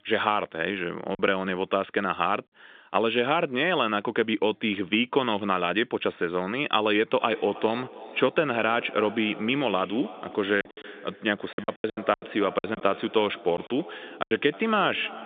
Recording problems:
echo of what is said; noticeable; from 7 s on; 320 ms later, 15 dB below the speech
phone-call audio; nothing above 3.5 kHz
choppy; very; at 1 s and from 11 to 14 s; 13% of the speech affected

